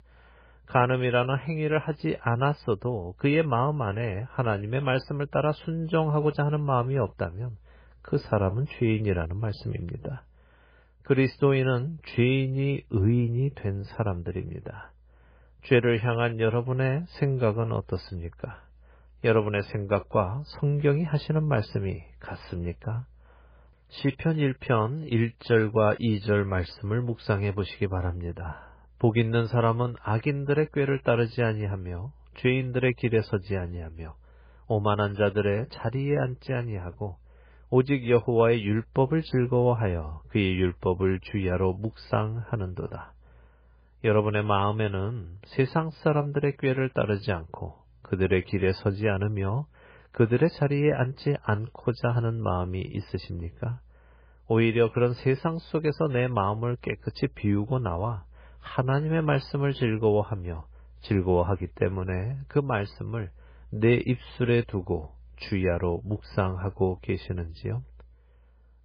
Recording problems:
garbled, watery; badly; nothing above 5 kHz

